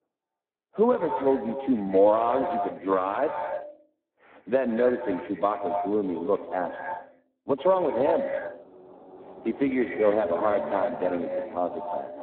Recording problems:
phone-call audio; poor line
echo of what is said; strong; throughout; 80 ms later, 6 dB below the speech
muffled; very; fading above 1.5 kHz
traffic noise; noticeable; from 8 s on; 15 dB below the speech

